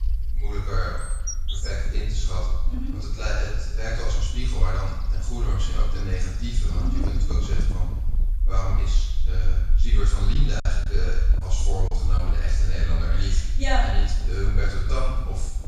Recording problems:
off-mic speech; far
room echo; noticeable; dies away in 1 s
animal sounds; noticeable; throughout; 10 dB below the speech
wind noise on the microphone; occasional gusts; from 2 to 8 s and from 10 s on; 15 dB below the speech
low rumble; noticeable; throughout; 15 dB below the speech
choppy; very; from 10 to 12 s; 6% of the speech affected

